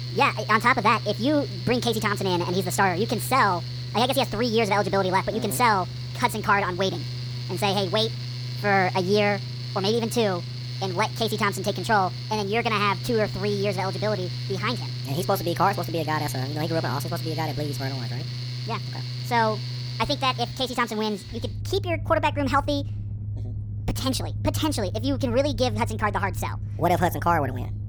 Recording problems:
wrong speed and pitch; too fast and too high; 1.5 times normal speed
machinery noise; loud; throughout; 7 dB below the speech

